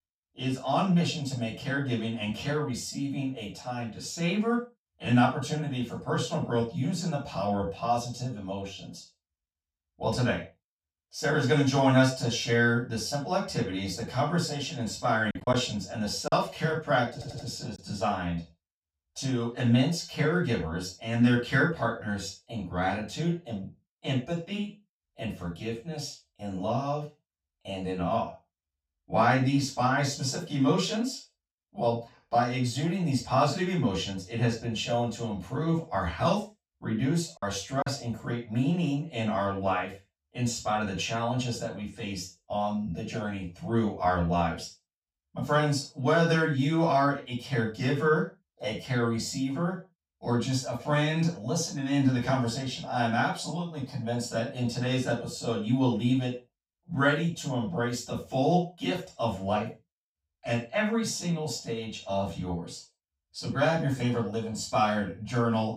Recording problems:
off-mic speech; far
room echo; noticeable; dies away in 0.3 s
choppy; occasionally; from 15 to 16 s and at 37 s; 4% of the speech affected
audio stuttering; at 17 s

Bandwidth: 15.5 kHz